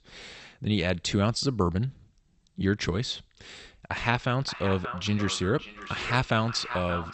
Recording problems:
echo of what is said; strong; from 4 s on; 580 ms later, 10 dB below the speech
garbled, watery; slightly; nothing above 8 kHz

